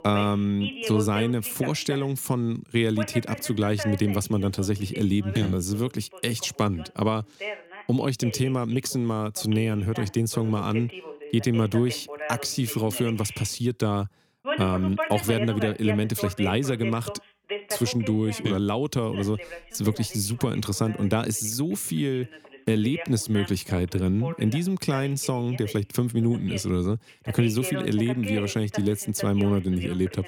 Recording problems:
voice in the background; noticeable; throughout; 10 dB below the speech

